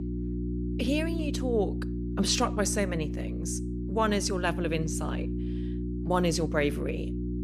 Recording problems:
electrical hum; loud; throughout; 60 Hz, 10 dB below the speech

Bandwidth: 14.5 kHz